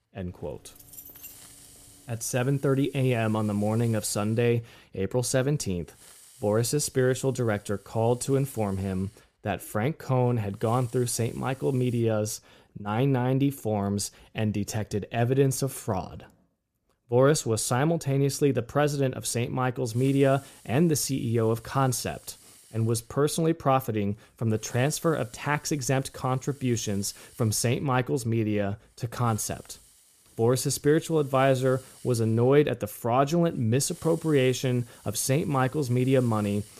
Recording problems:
hiss; faint; until 12 s and from 20 s on; 25 dB below the speech
jangling keys; faint; until 2 s; peak 15 dB below the speech

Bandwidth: 14.5 kHz